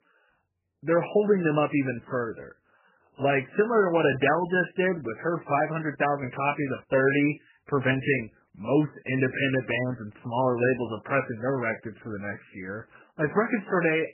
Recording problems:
garbled, watery; badly; nothing above 3 kHz

